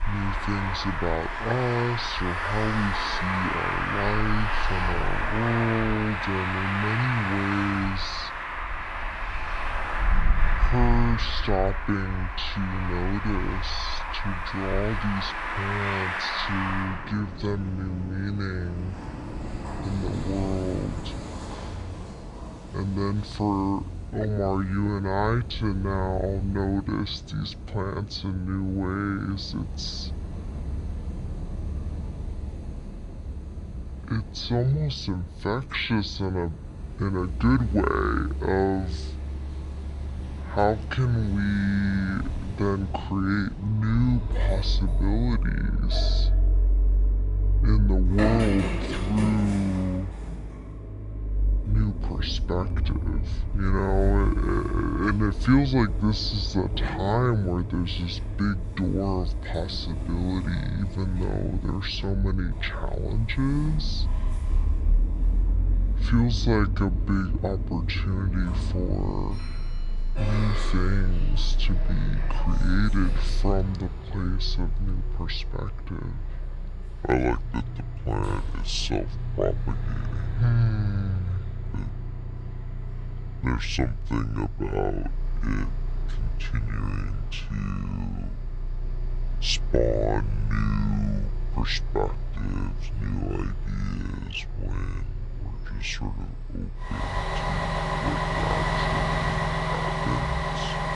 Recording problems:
wrong speed and pitch; too slow and too low; 0.6 times normal speed
traffic noise; loud; throughout; 3 dB below the speech

